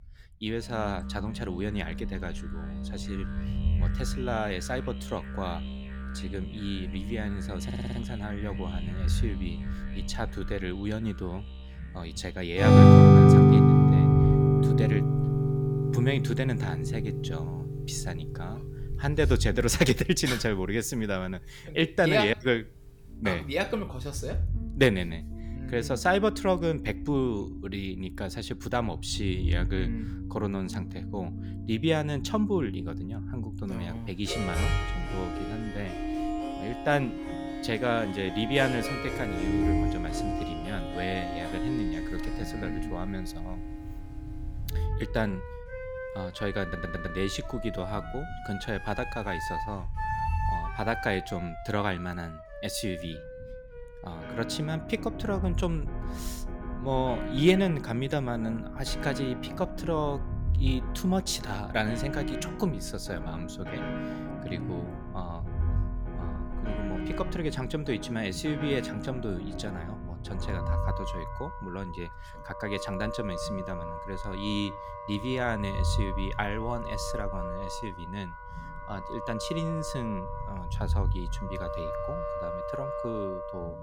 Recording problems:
background music; very loud; throughout; 3 dB above the speech
low rumble; faint; throughout; 20 dB below the speech
audio stuttering; at 7.5 s and at 47 s

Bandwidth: 18.5 kHz